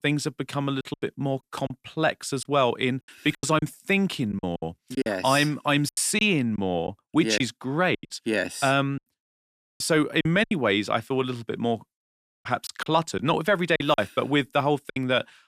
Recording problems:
choppy; very; 9% of the speech affected

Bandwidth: 14.5 kHz